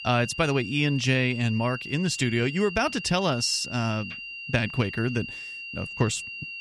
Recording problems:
high-pitched whine; loud; throughout; 3 kHz, 10 dB below the speech

